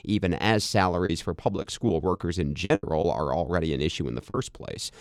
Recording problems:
choppy; very; from 1.5 to 3 s and at 4.5 s; 9% of the speech affected

